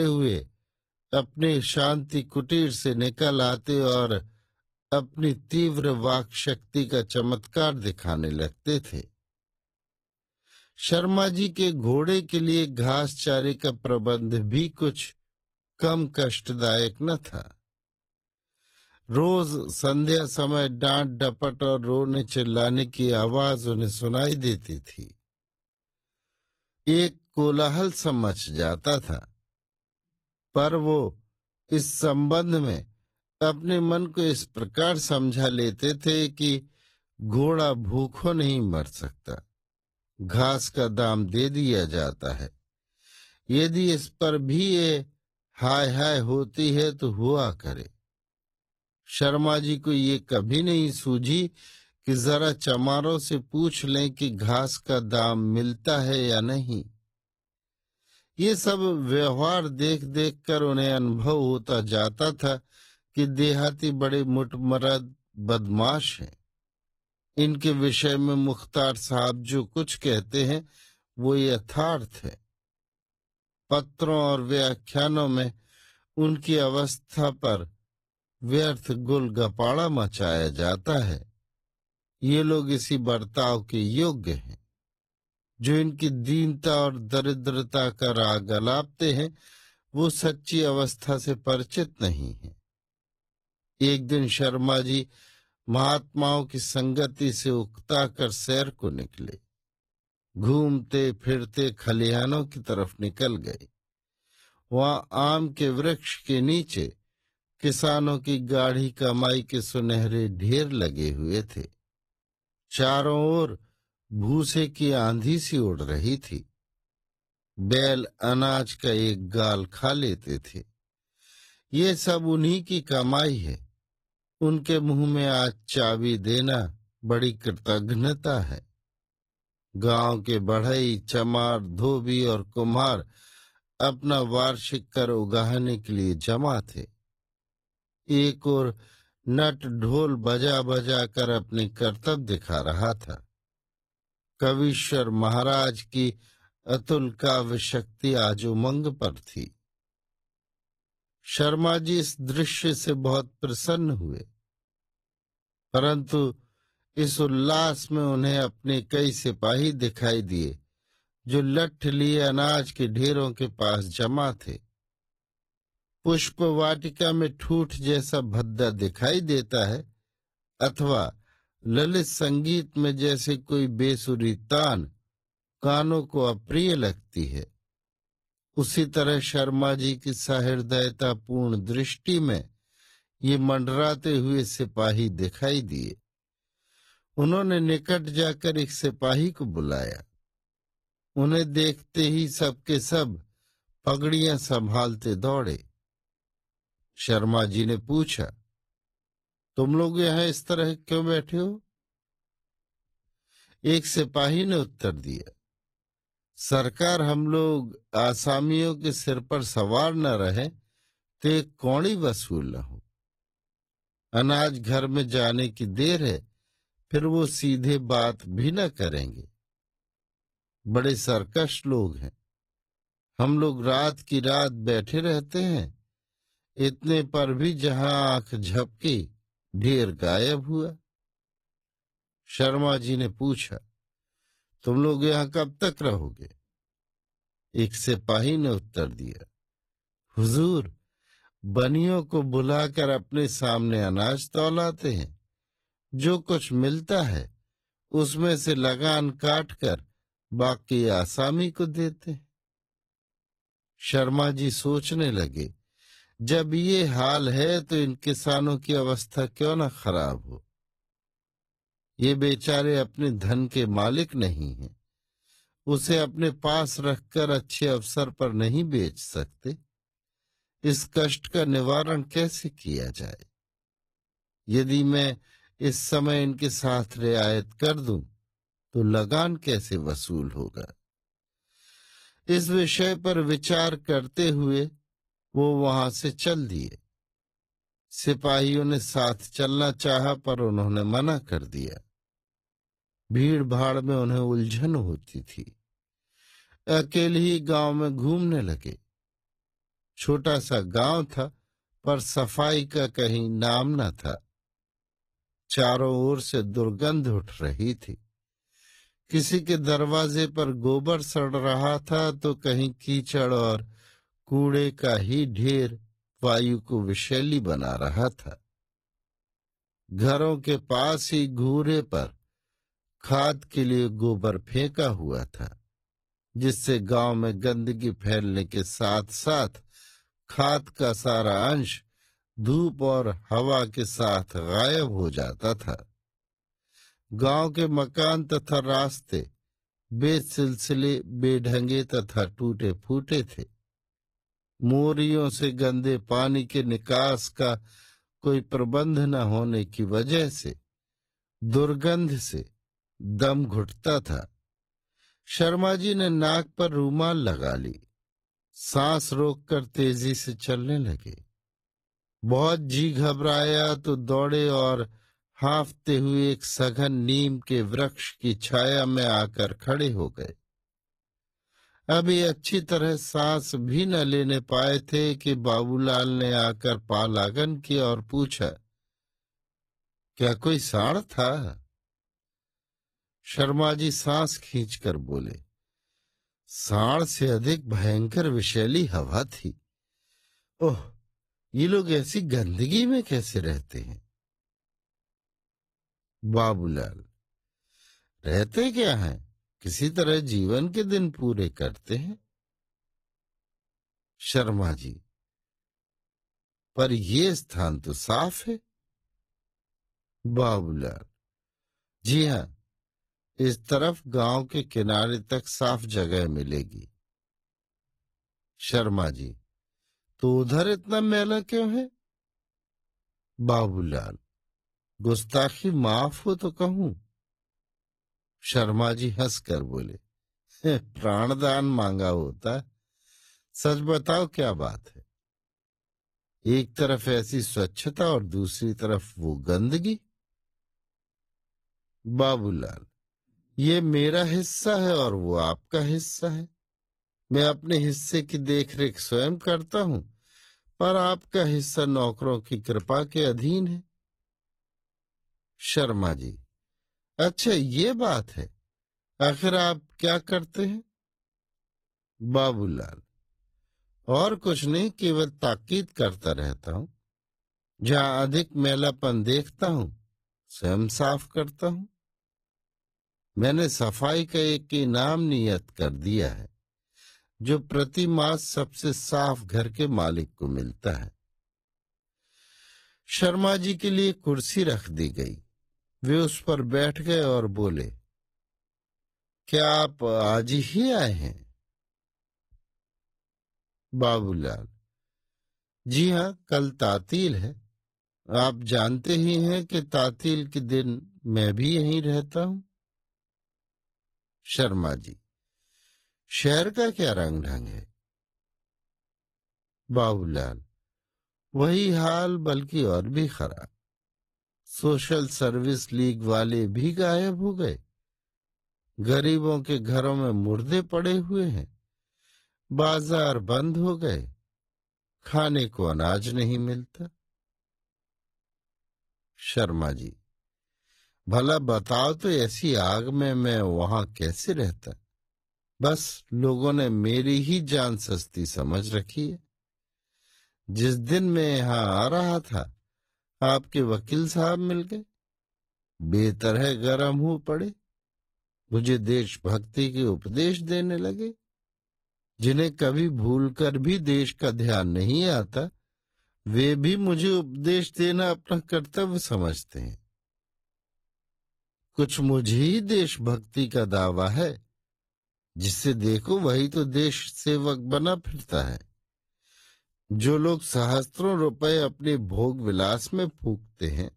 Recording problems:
wrong speed, natural pitch; too slow; 0.6 times normal speed
garbled, watery; slightly; nothing above 14.5 kHz
abrupt cut into speech; at the start

